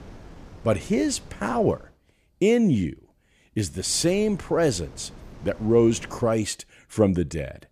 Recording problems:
wind noise on the microphone; occasional gusts; until 2 s and from 4 to 6.5 s; 25 dB below the speech

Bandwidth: 14.5 kHz